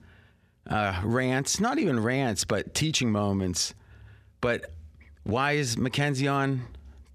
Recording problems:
none

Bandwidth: 15 kHz